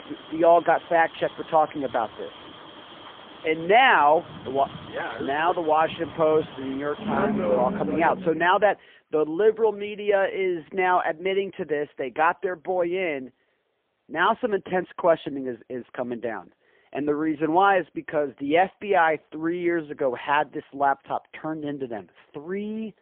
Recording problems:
phone-call audio; poor line; nothing above 3.5 kHz
traffic noise; noticeable; until 8 s; 10 dB below the speech

